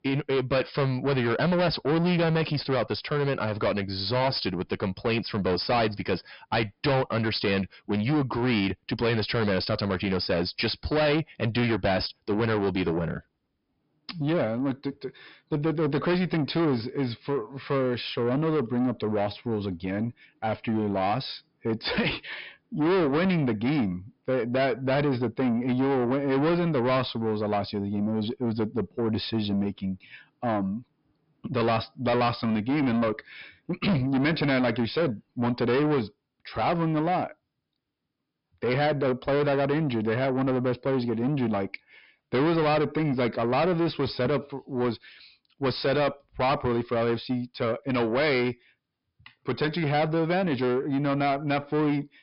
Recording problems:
distortion; heavy; 6 dB below the speech
high frequencies cut off; noticeable; nothing above 5.5 kHz

